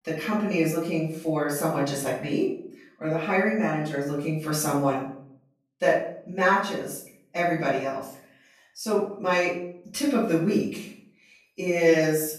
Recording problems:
off-mic speech; far
room echo; noticeable; dies away in 0.5 s

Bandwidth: 14 kHz